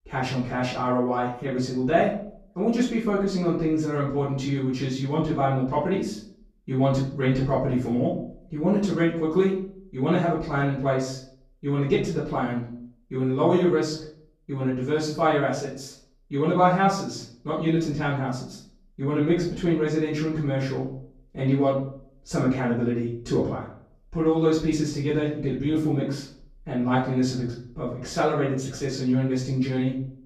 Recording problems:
off-mic speech; far
room echo; noticeable; dies away in 0.5 s

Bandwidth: 14.5 kHz